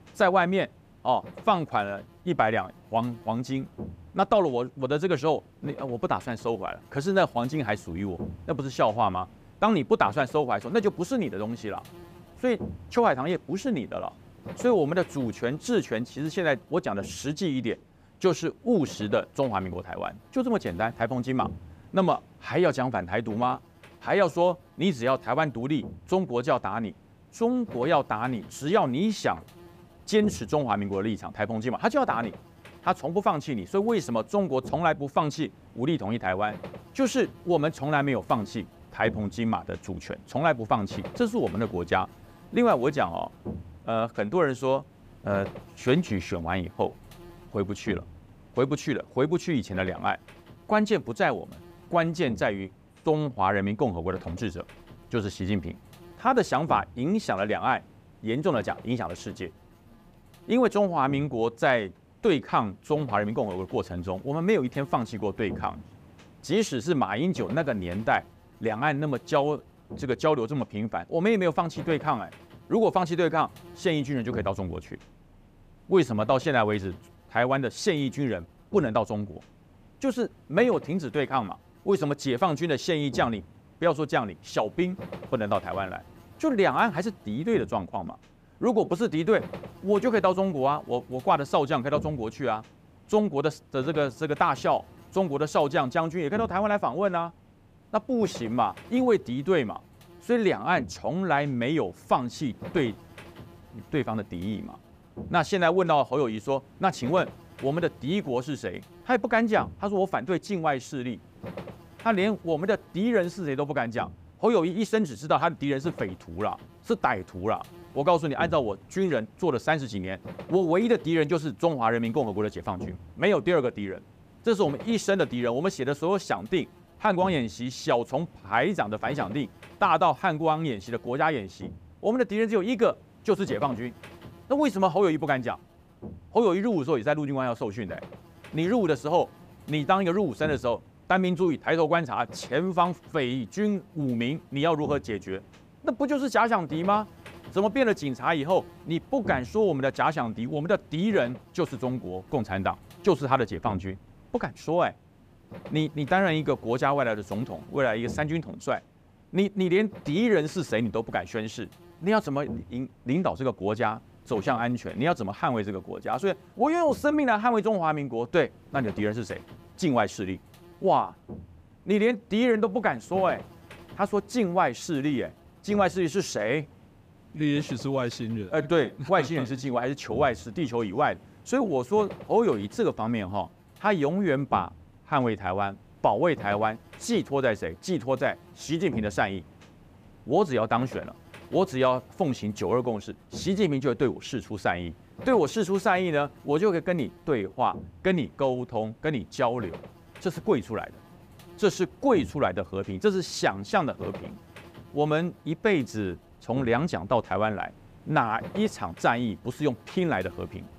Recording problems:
electrical hum; faint; throughout; 50 Hz, 25 dB below the speech

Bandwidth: 15 kHz